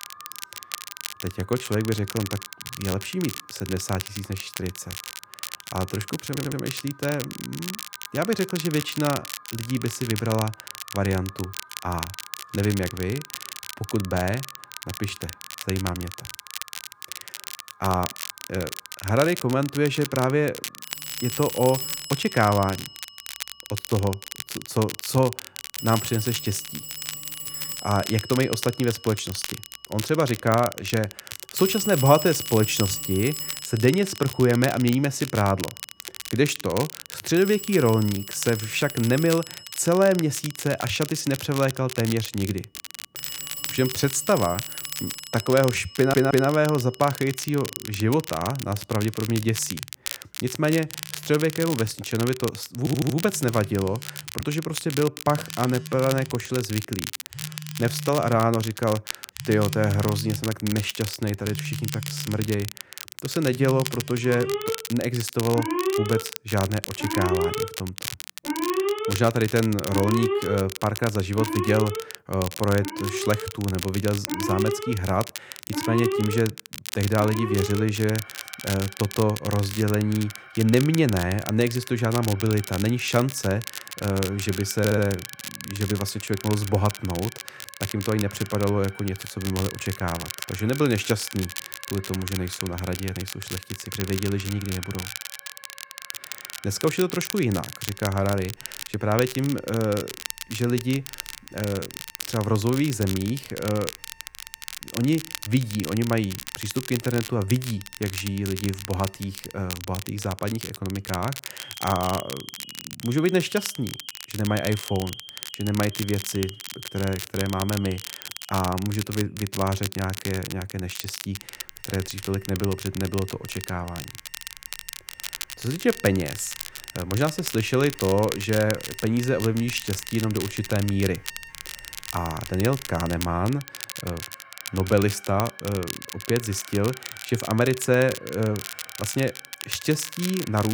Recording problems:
alarms or sirens; loud; throughout; 9 dB below the speech
crackle, like an old record; loud; 9 dB below the speech
audio stuttering; 4 times, first at 6.5 s
abrupt cut into speech; at the end

